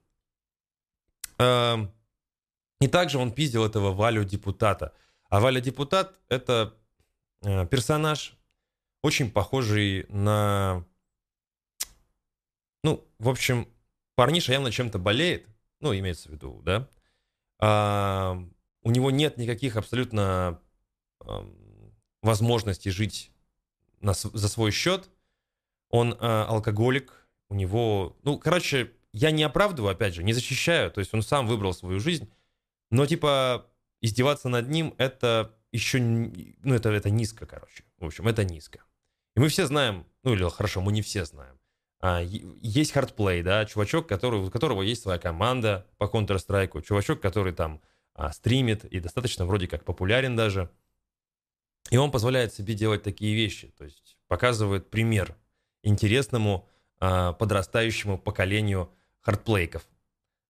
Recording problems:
none

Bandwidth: 14.5 kHz